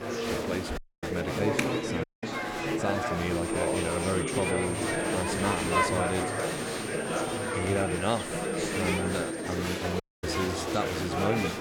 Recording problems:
chatter from many people; very loud; throughout; 3 dB above the speech
high-pitched whine; loud; from 3.5 to 9.5 s; 8.5 kHz, 7 dB below the speech
audio cutting out; at 1 s, at 2 s and at 10 s

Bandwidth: 18.5 kHz